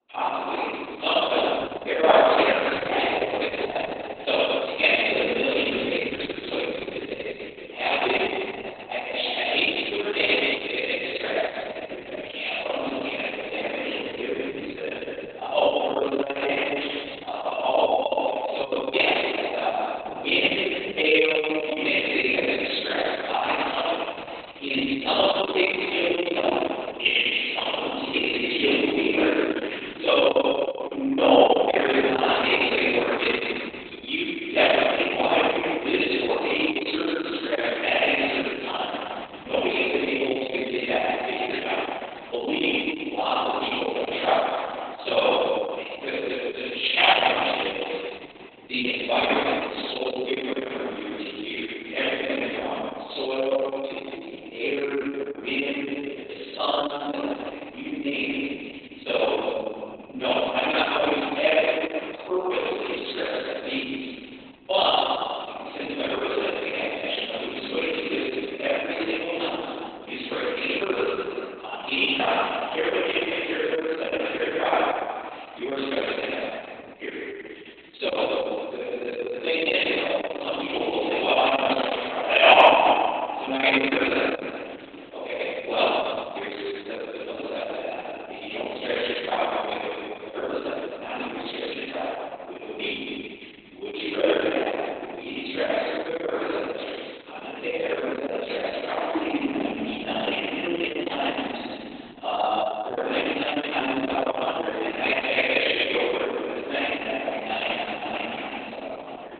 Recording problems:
room echo; strong; dies away in 2.4 s
off-mic speech; far
garbled, watery; badly; nothing above 4 kHz
thin; somewhat; fading below 300 Hz

